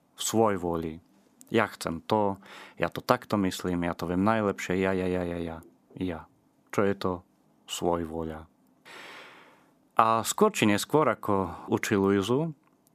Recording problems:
none

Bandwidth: 14.5 kHz